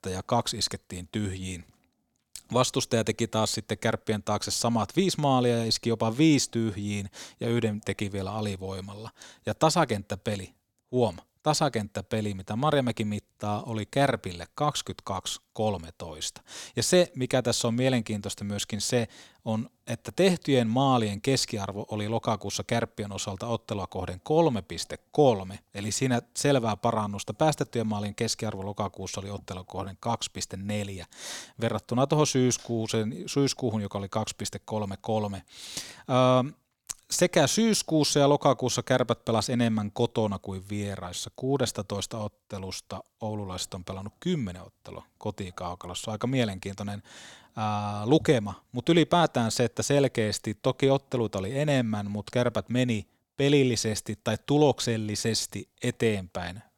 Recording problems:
none

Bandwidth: 18.5 kHz